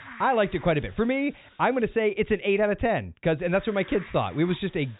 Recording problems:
high frequencies cut off; severe; nothing above 4 kHz
hiss; faint; until 2 s and from 3.5 s on; 20 dB below the speech

